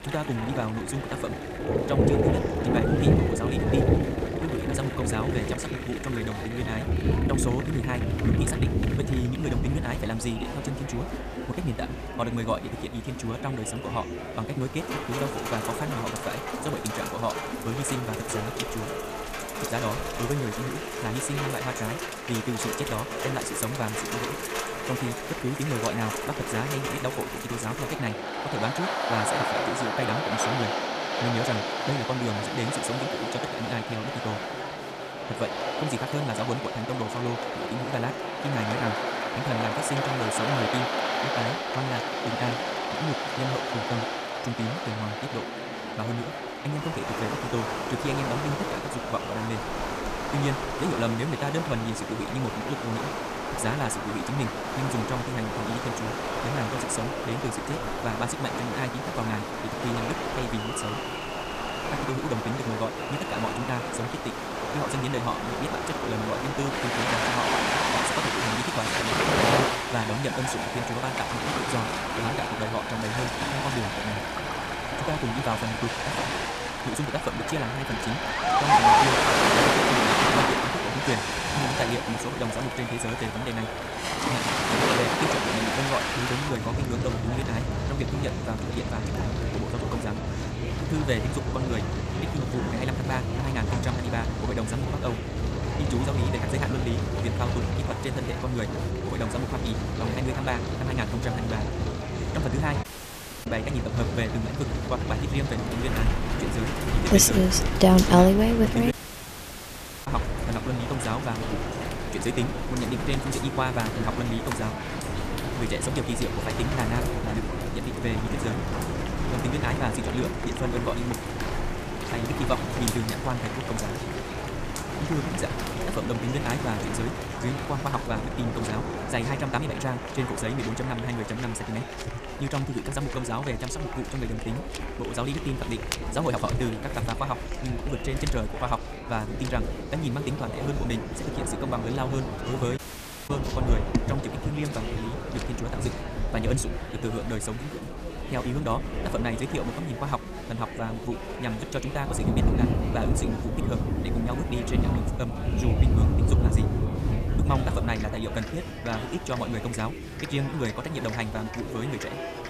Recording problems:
wrong speed, natural pitch; too fast; 1.7 times normal speed
rain or running water; very loud; throughout; 3 dB above the speech
murmuring crowd; loud; throughout; 6 dB below the speech
audio cutting out; at 1:43 for 0.5 s, at 1:49 for 1 s and at 2:23 for 0.5 s

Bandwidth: 14.5 kHz